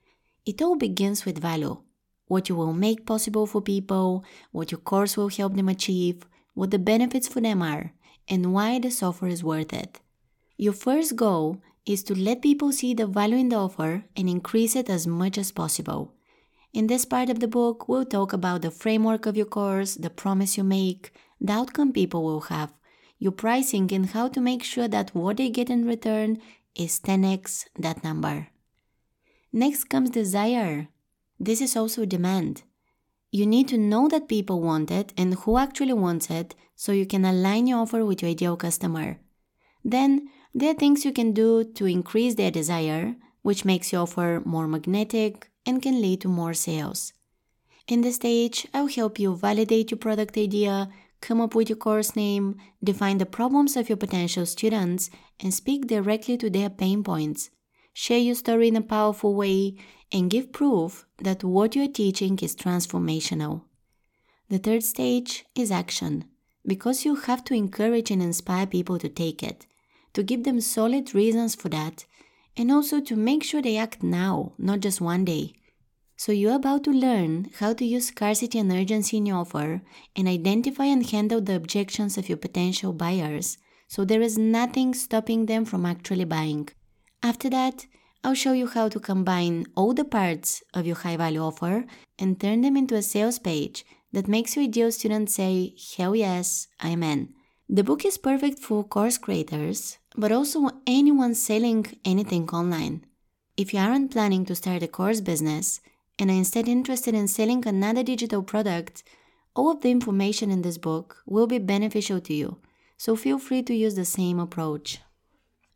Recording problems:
none

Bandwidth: 17 kHz